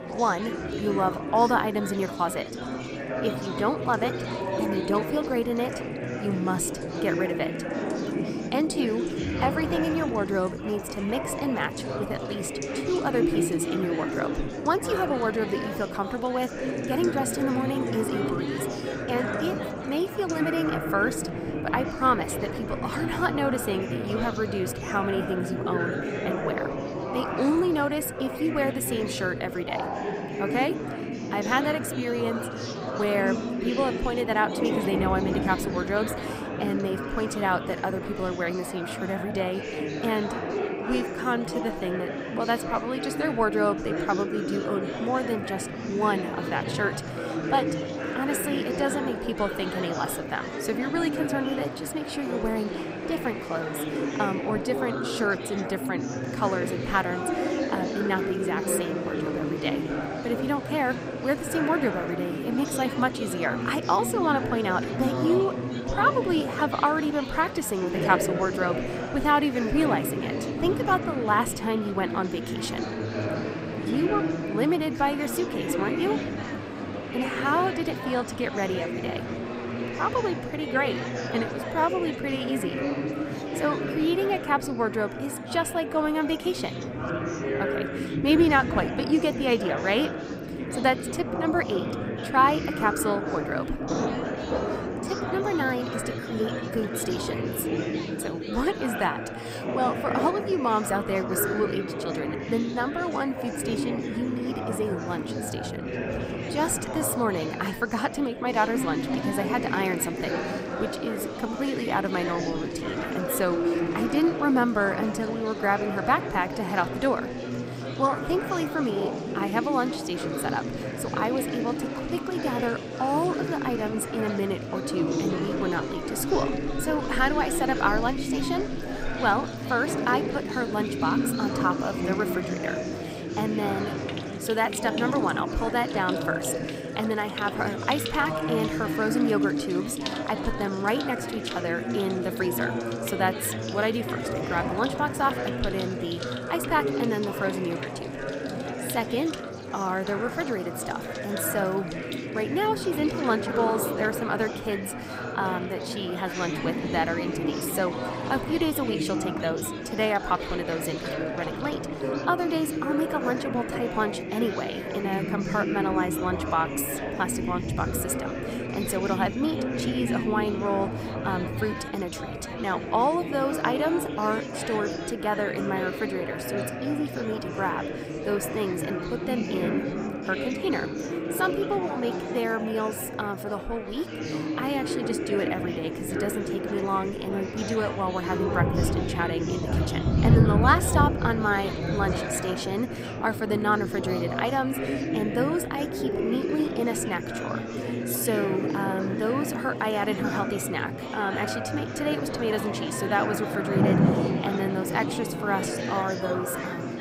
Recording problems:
rain or running water; loud; throughout; 10 dB below the speech
chatter from many people; loud; throughout; 3 dB below the speech

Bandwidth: 15.5 kHz